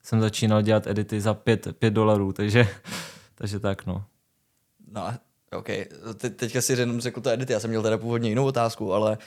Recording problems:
none

